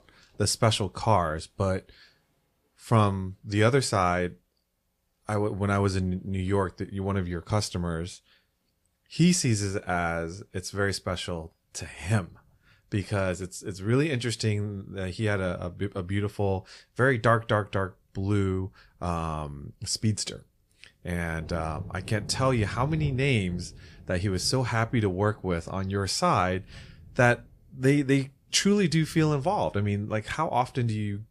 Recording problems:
rain or running water; noticeable; throughout; 15 dB below the speech

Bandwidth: 15 kHz